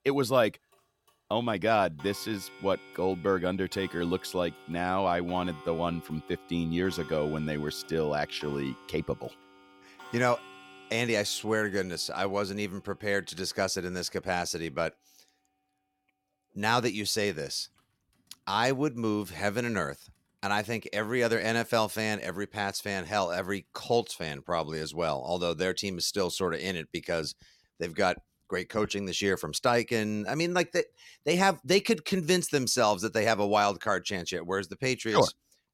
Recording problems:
household noises; noticeable; throughout; 20 dB below the speech

